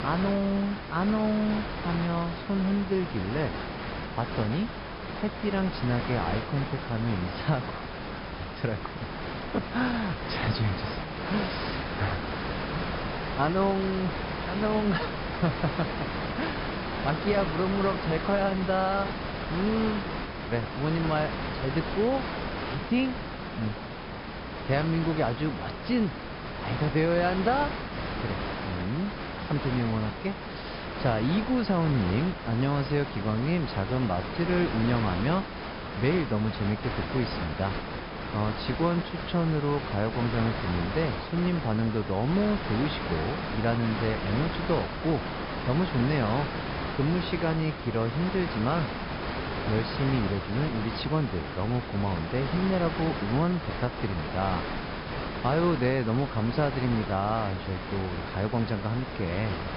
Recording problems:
high frequencies cut off; noticeable; nothing above 5.5 kHz
hiss; loud; throughout; 5 dB below the speech

